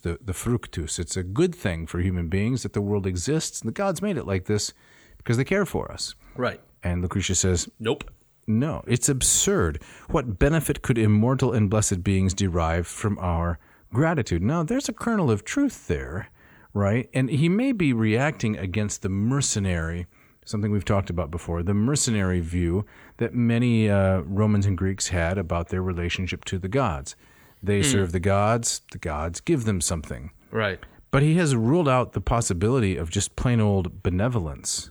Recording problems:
none

